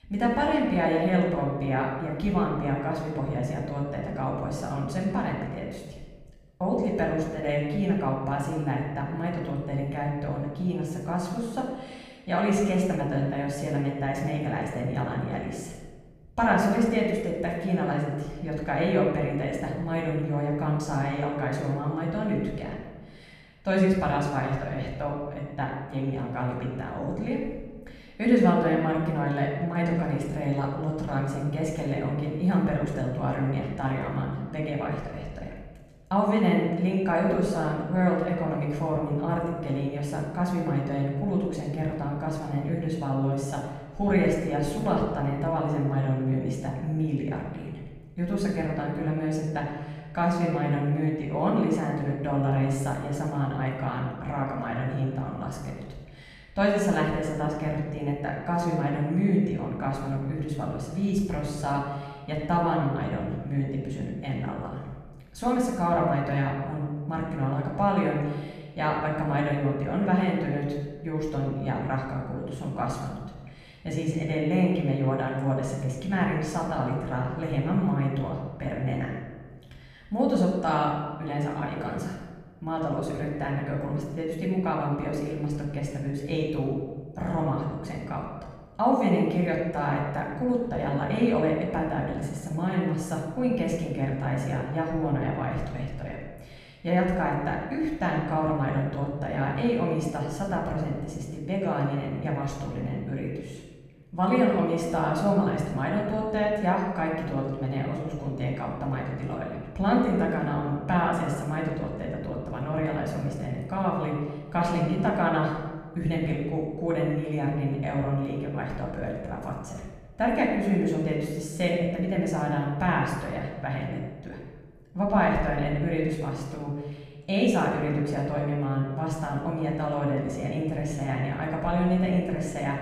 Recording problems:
off-mic speech; far
room echo; noticeable; dies away in 1.2 s

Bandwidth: 14.5 kHz